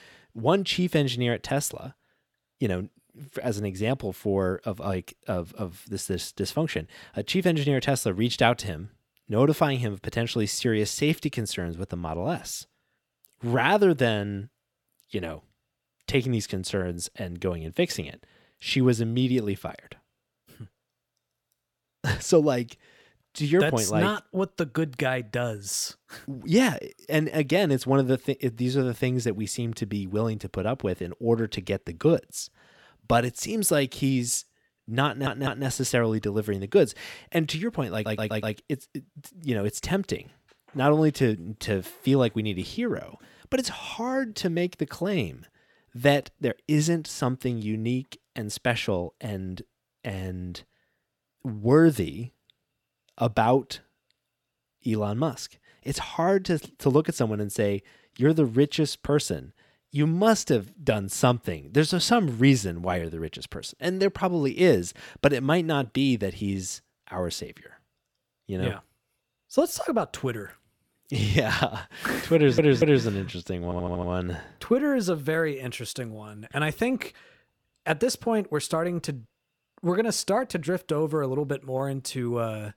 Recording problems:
audio stuttering; 4 times, first at 35 s

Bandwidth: 18 kHz